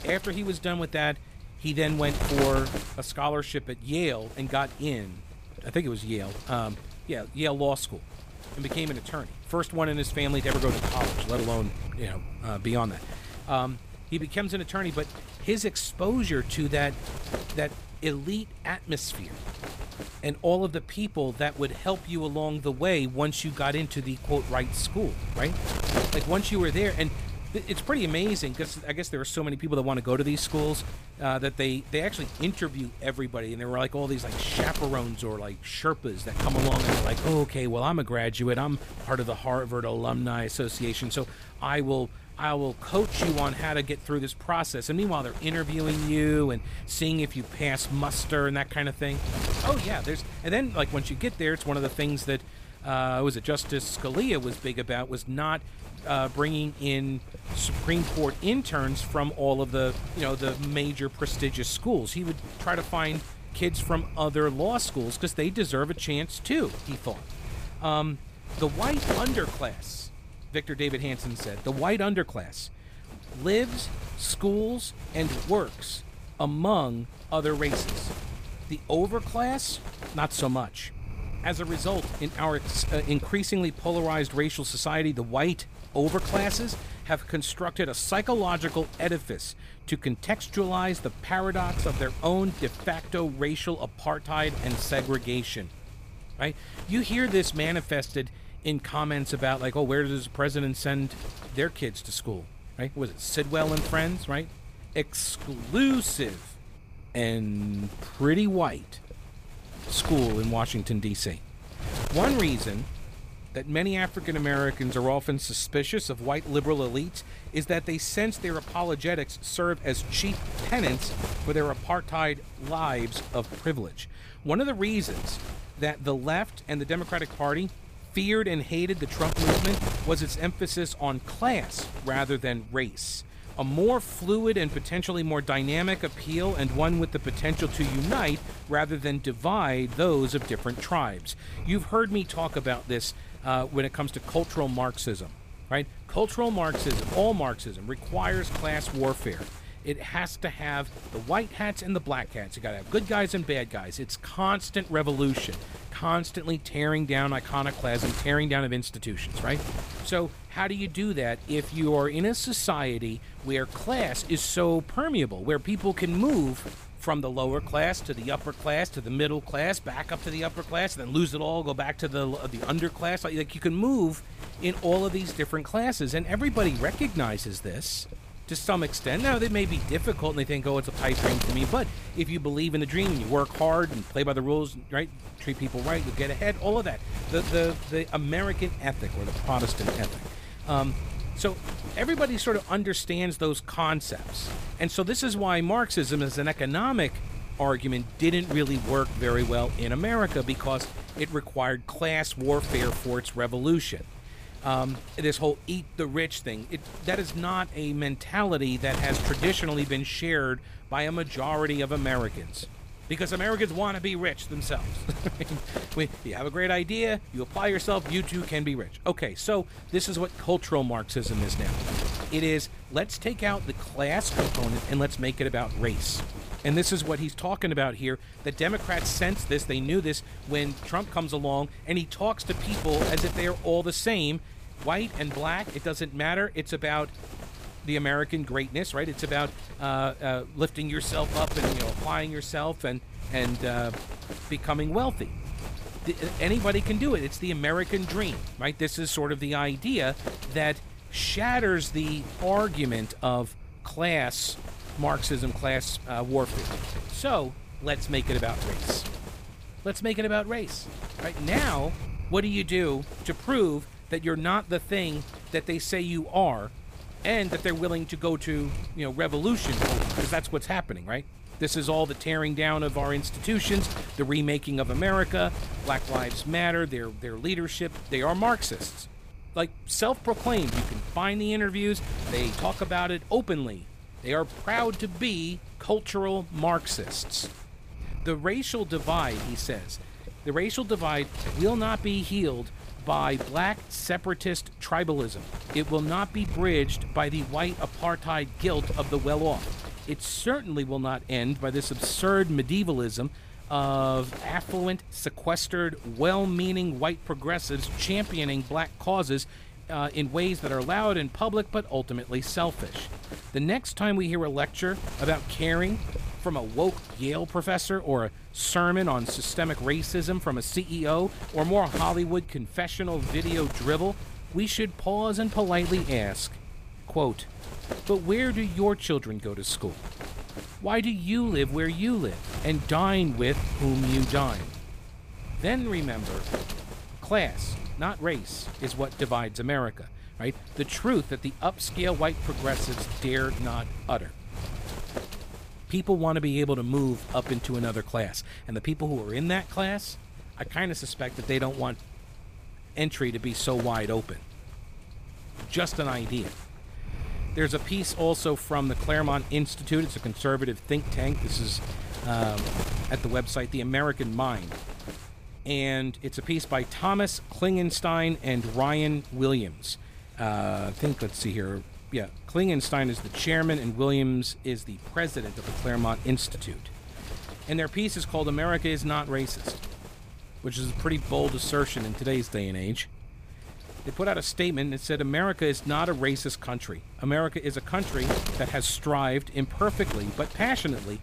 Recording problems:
wind noise on the microphone; occasional gusts; 10 dB below the speech

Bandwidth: 15 kHz